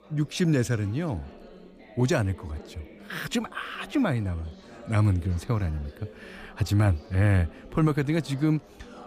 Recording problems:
chatter from many people; faint; throughout; 20 dB below the speech

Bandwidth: 15 kHz